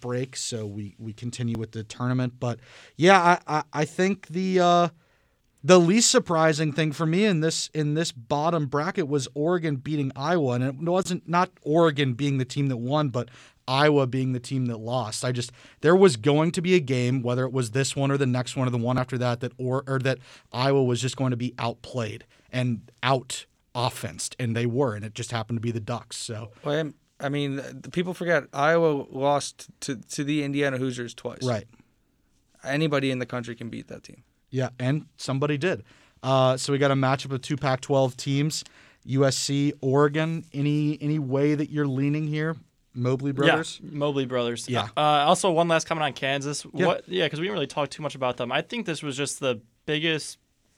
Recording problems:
none

